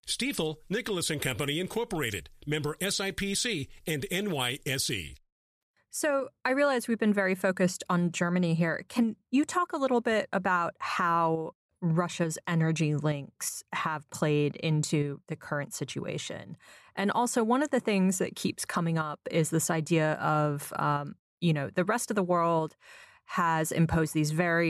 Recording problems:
abrupt cut into speech; at the end

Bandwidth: 14.5 kHz